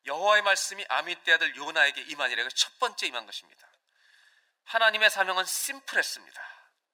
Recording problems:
thin; very; fading below 550 Hz

